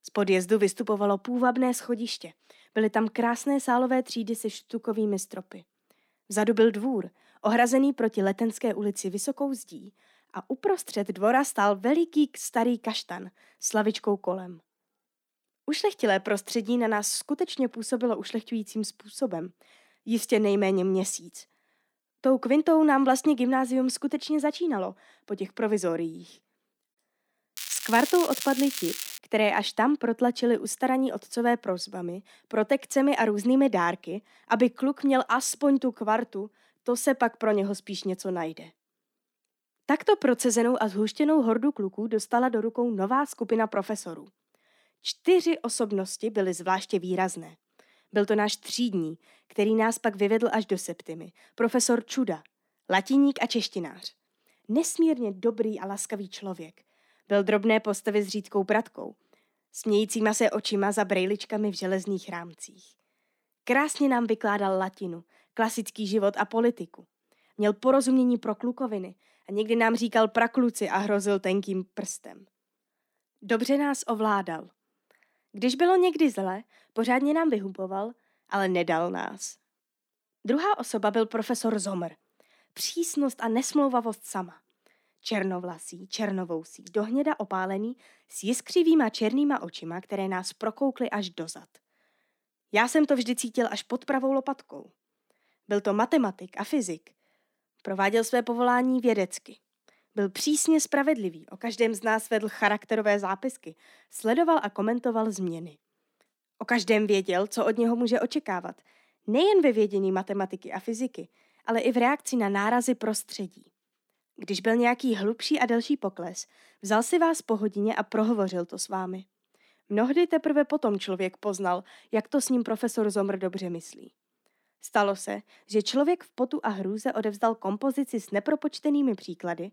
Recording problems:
crackling; loud; from 28 to 29 s; 7 dB below the speech

